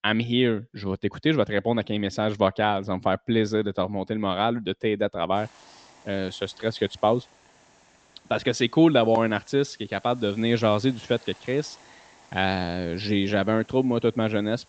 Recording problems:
high frequencies cut off; noticeable; nothing above 8 kHz
hiss; faint; from 5.5 s on; 30 dB below the speech

